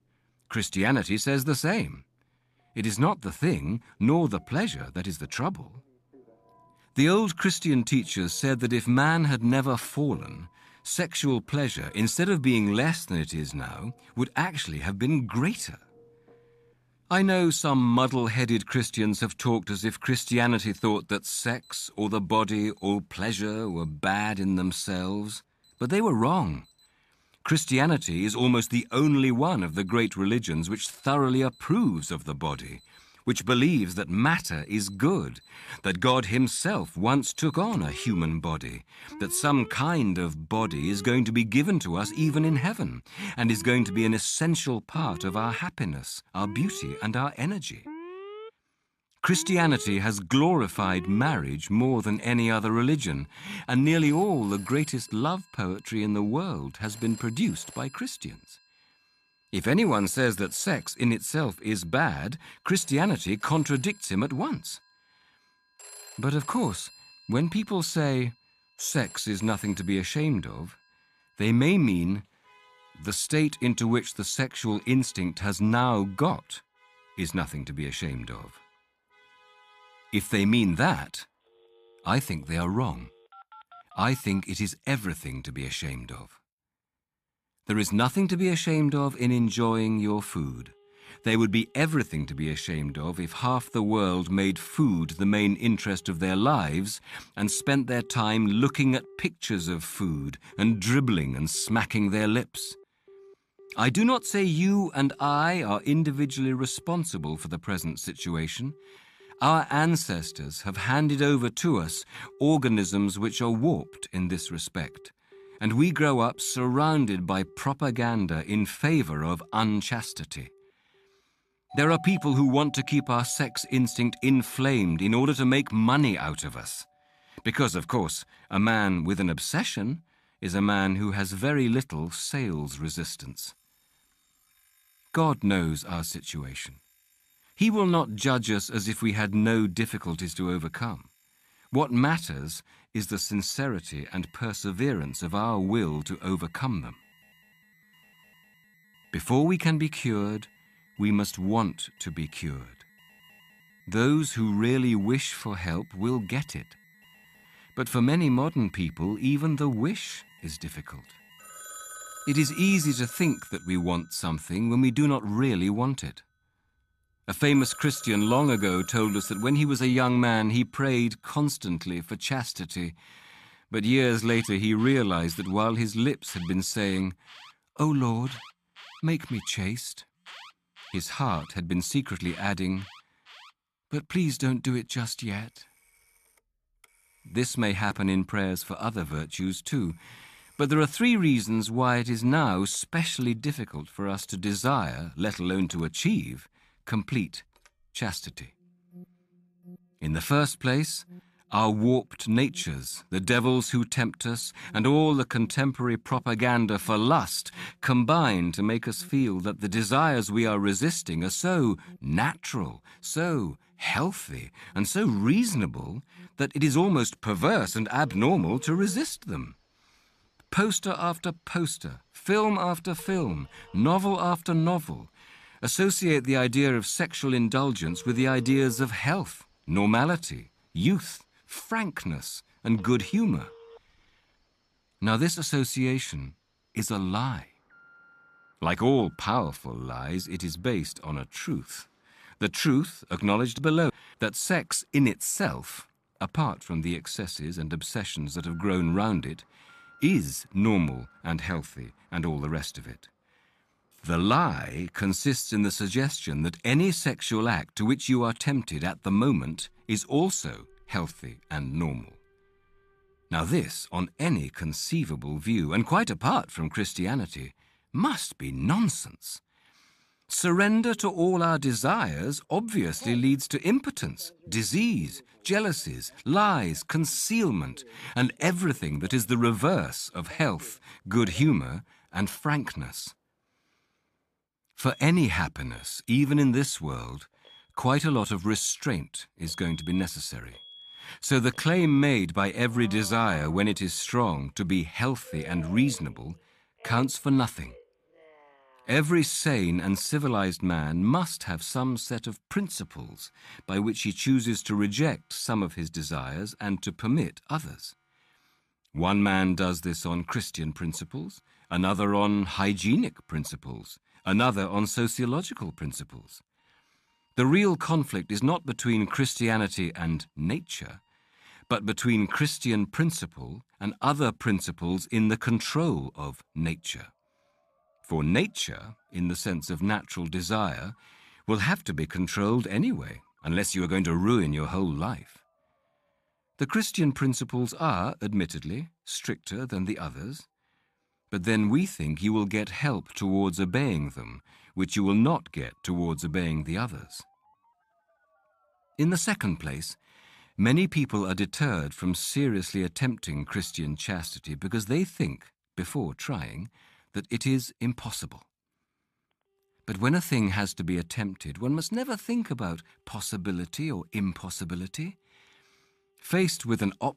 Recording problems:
alarms or sirens; faint; throughout; 25 dB below the speech

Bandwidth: 14.5 kHz